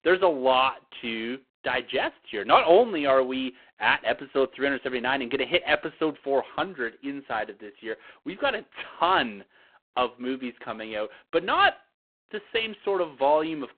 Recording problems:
phone-call audio; poor line

